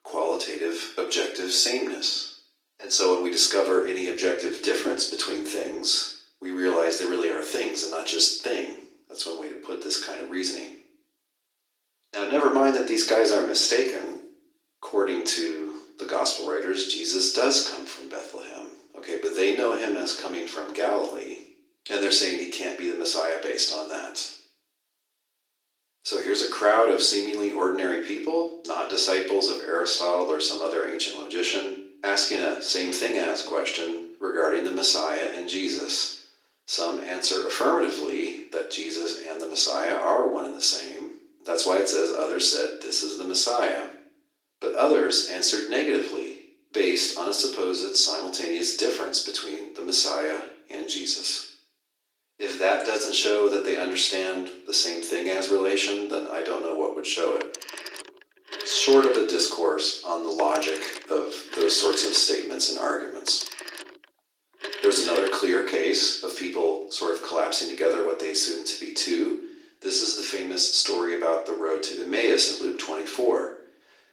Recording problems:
off-mic speech; far
thin; very; fading below 300 Hz
room echo; slight; dies away in 0.5 s
garbled, watery; slightly; nothing above 15.5 kHz
phone ringing; noticeable; from 57 s to 1:05; peak 6 dB below the speech

